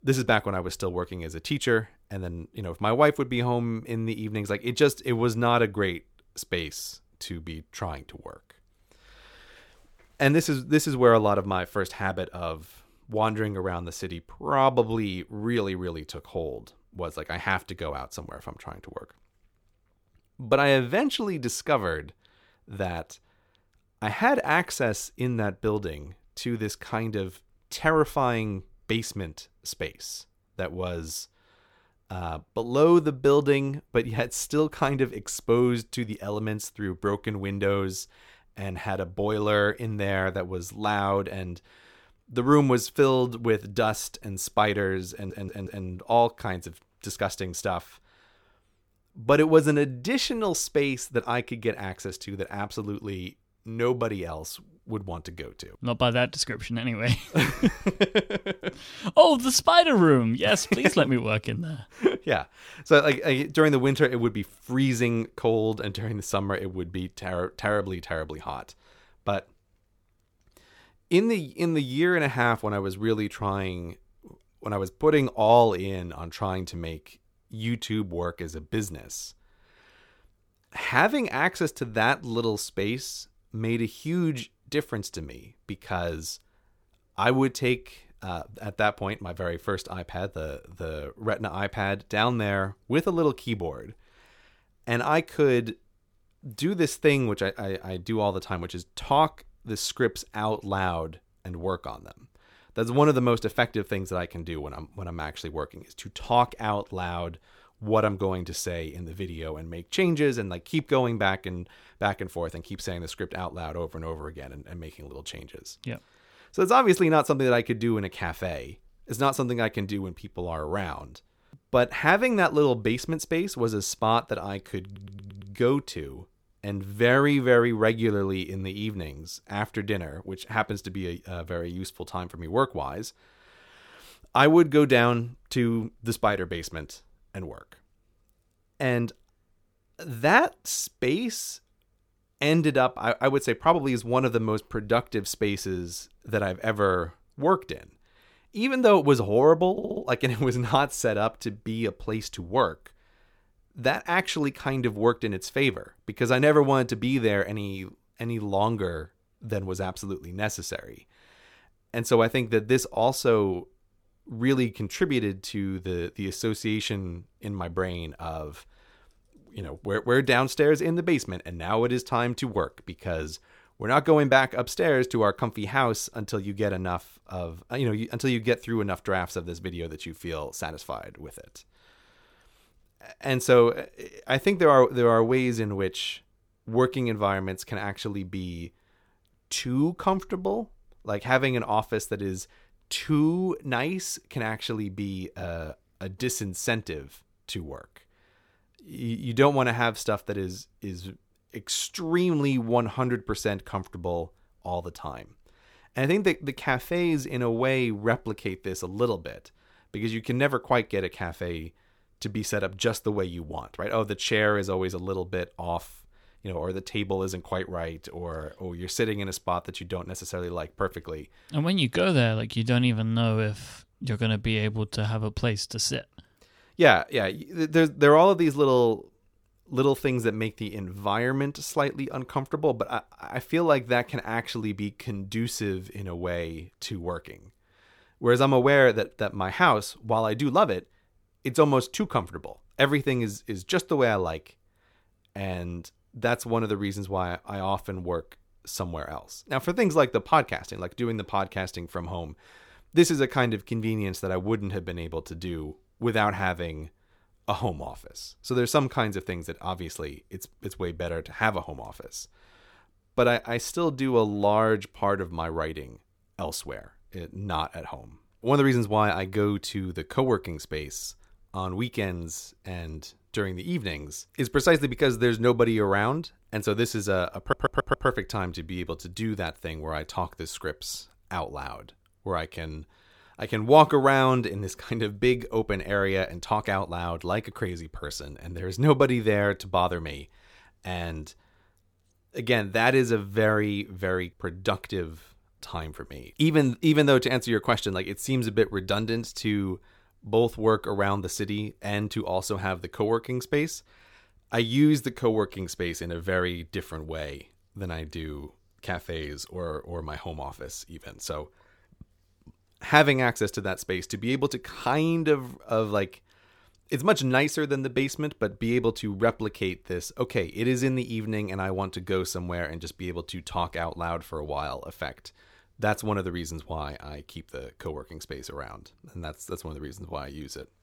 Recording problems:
audio stuttering; 4 times, first at 45 s

